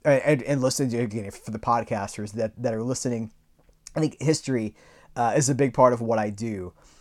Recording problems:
none

